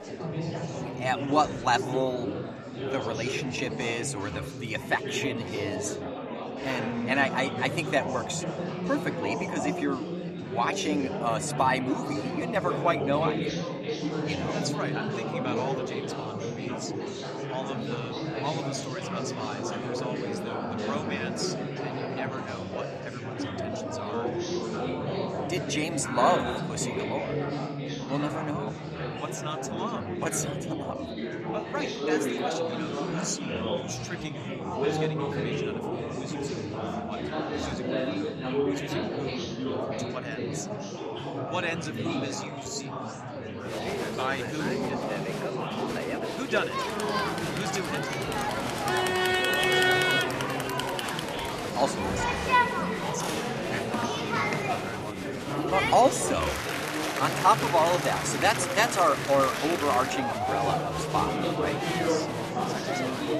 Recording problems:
chatter from many people; very loud; throughout; as loud as the speech

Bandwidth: 13.5 kHz